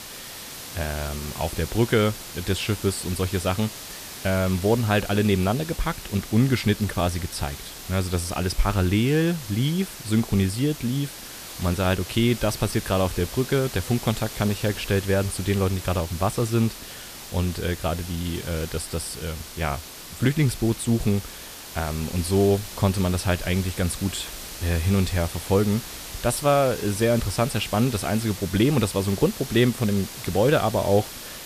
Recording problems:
hiss; noticeable; throughout; 10 dB below the speech

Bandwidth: 14.5 kHz